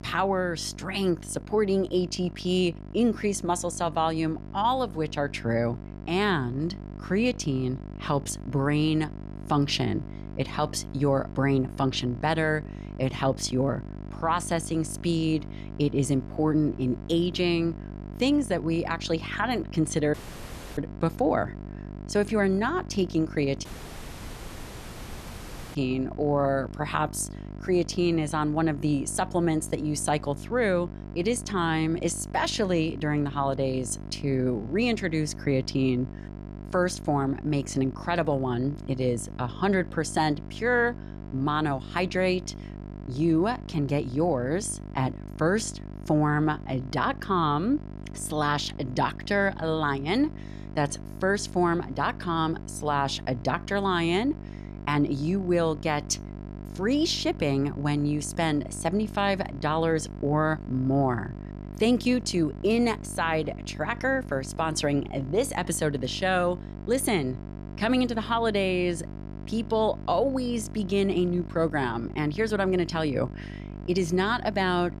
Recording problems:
electrical hum; noticeable; throughout; 50 Hz, 20 dB below the speech
audio cutting out; at 20 s for 0.5 s and at 24 s for 2 s

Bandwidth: 13.5 kHz